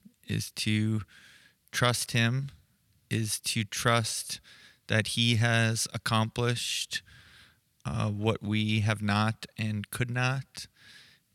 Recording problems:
none

